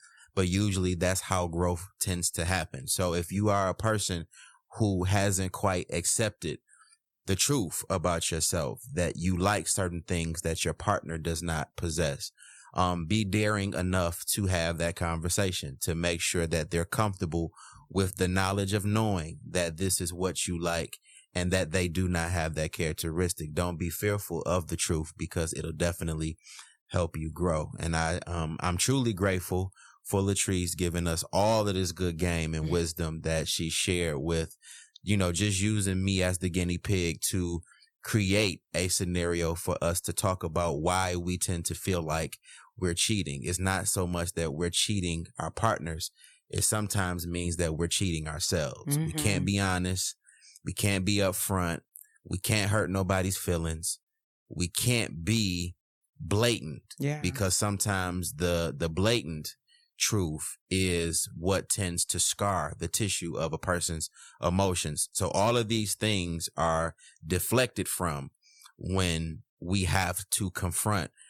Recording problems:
none

